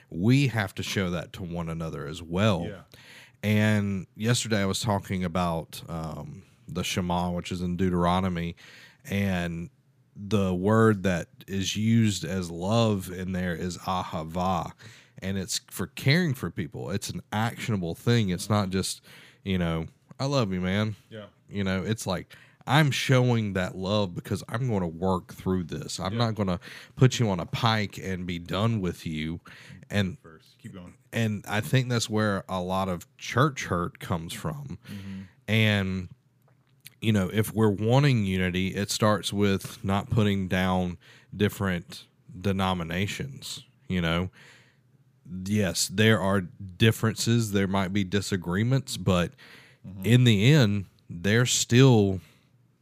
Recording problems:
none

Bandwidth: 15 kHz